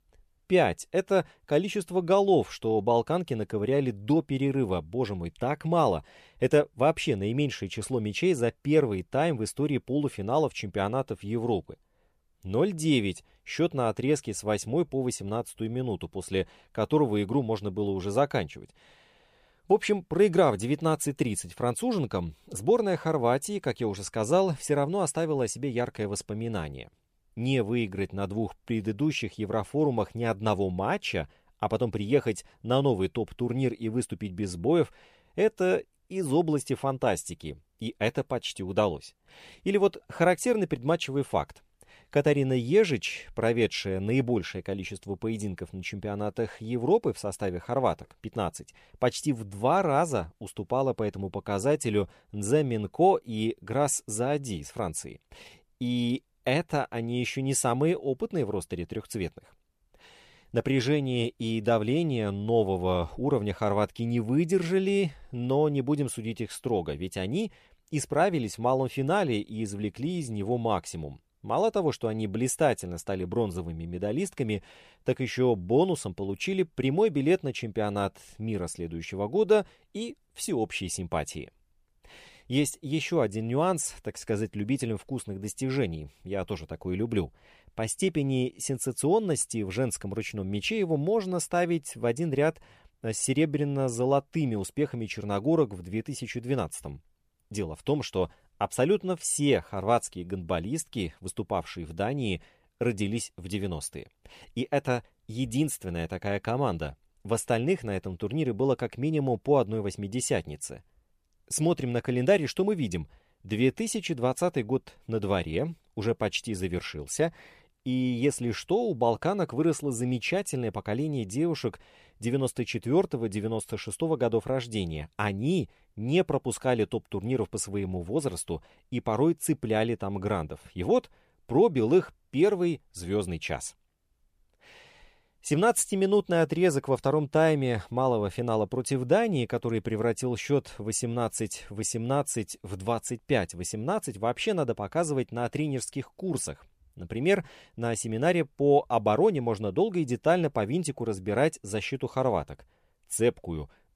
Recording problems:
none

